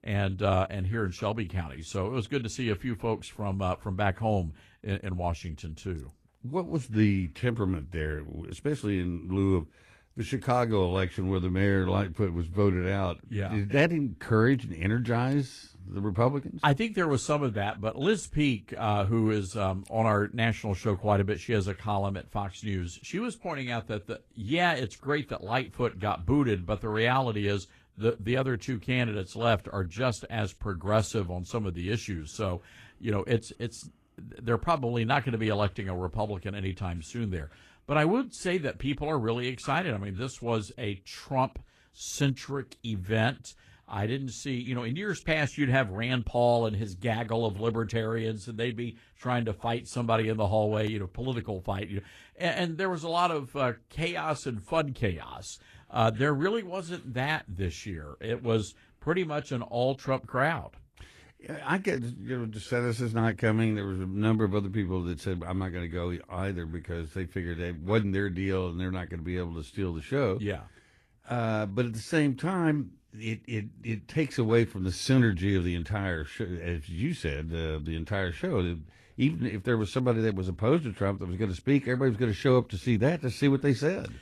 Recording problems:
garbled, watery; slightly; nothing above 12.5 kHz

